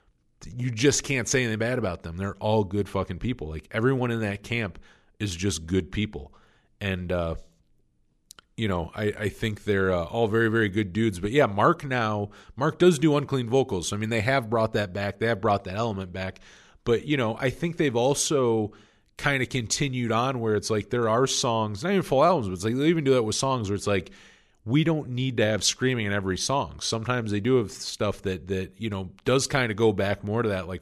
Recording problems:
none

